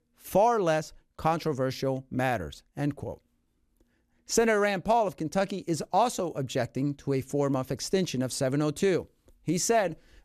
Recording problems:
none

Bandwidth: 14.5 kHz